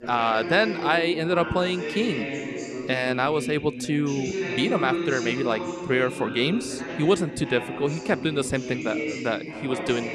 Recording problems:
background chatter; loud; throughout; 3 voices, 6 dB below the speech

